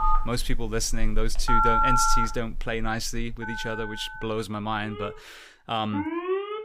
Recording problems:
alarms or sirens; very loud; throughout; 3 dB above the speech

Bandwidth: 15.5 kHz